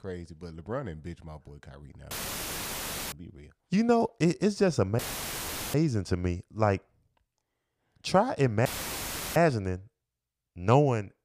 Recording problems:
audio cutting out; filled with static; at 2 s for 1 s, at 5 s for 1 s and at 8.5 s for 0.5 s

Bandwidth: 15 kHz